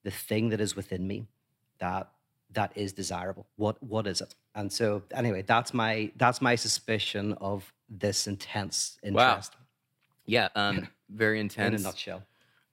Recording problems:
uneven, jittery; strongly; from 1 to 11 s

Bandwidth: 16 kHz